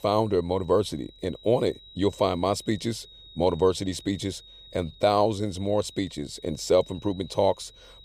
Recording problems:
high-pitched whine; faint; throughout; 4 kHz, 20 dB below the speech

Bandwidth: 15 kHz